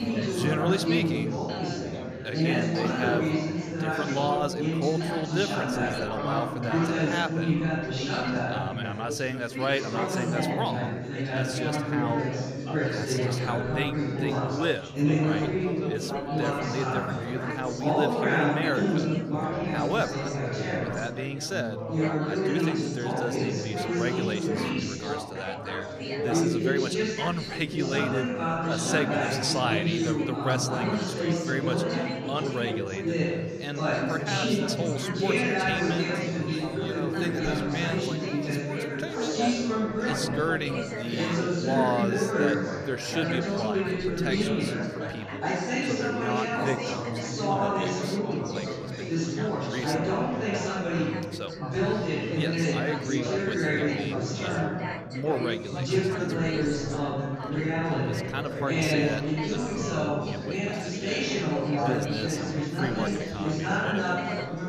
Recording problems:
chatter from many people; very loud; throughout; 5 dB above the speech

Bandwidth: 14.5 kHz